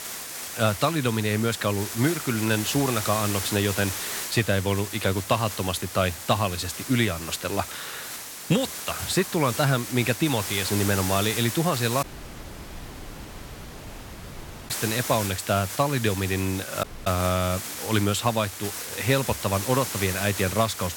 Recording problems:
hiss; loud; throughout; 6 dB below the speech
audio cutting out; at 12 s for 2.5 s and at 17 s

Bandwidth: 17 kHz